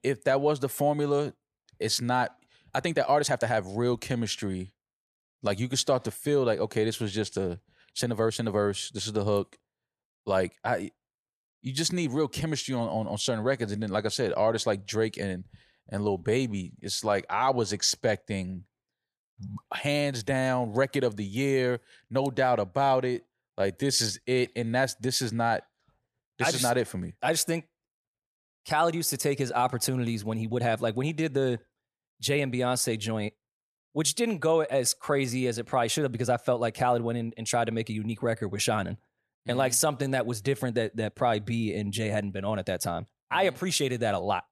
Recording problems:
uneven, jittery; strongly; from 2.5 to 40 s

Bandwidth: 14 kHz